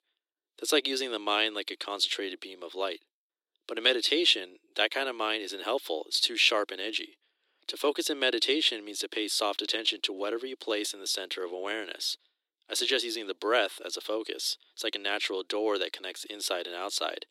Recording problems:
thin; very; fading below 300 Hz

